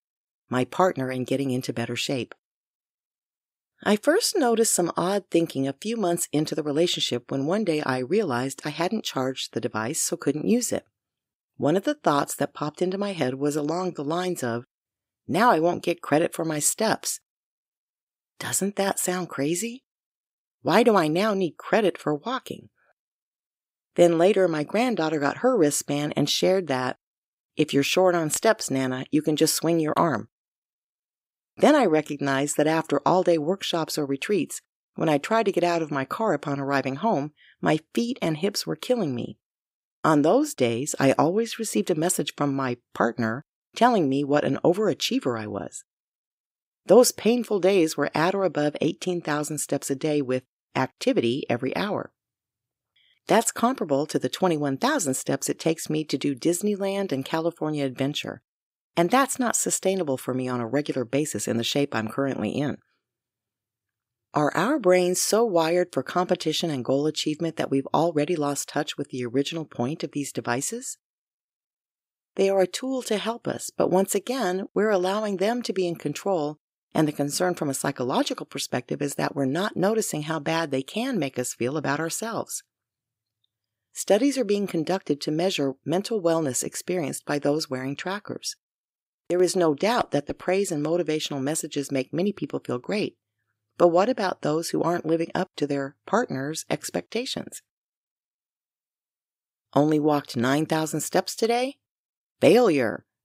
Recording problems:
none

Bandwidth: 15.5 kHz